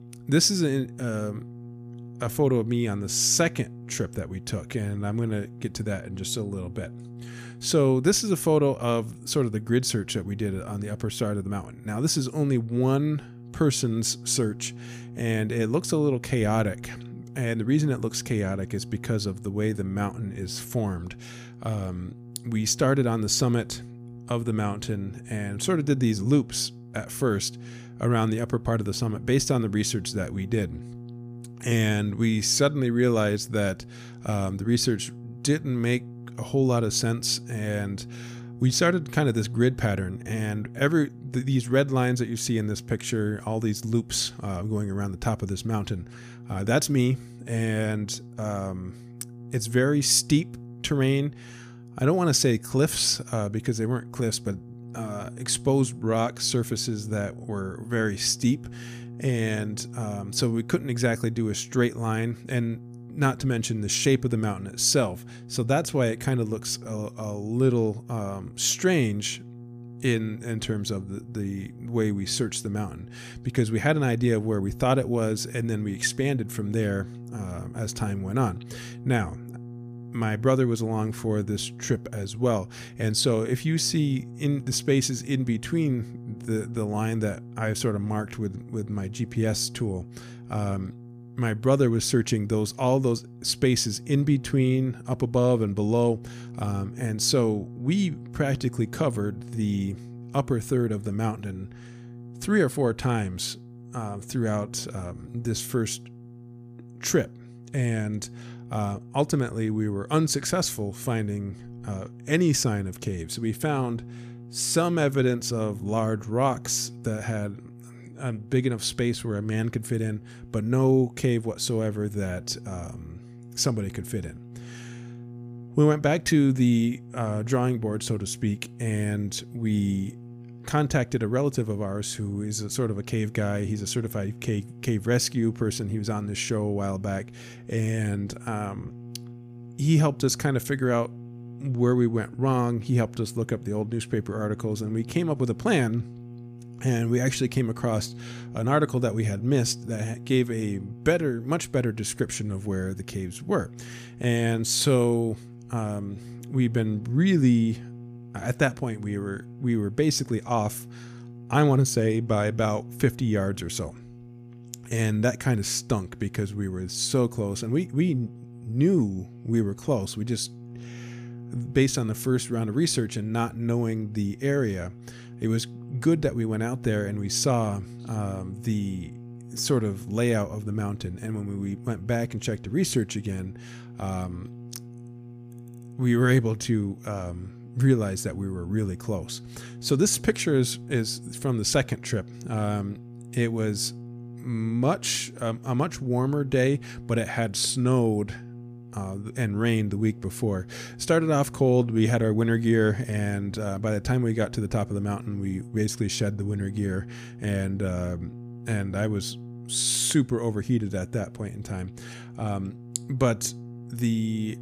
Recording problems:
electrical hum; faint; throughout; 60 Hz, 20 dB below the speech

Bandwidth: 15 kHz